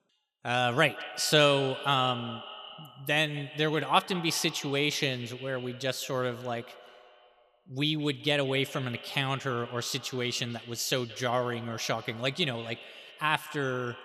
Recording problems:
echo of what is said; noticeable; throughout; 170 ms later, 15 dB below the speech

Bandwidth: 14.5 kHz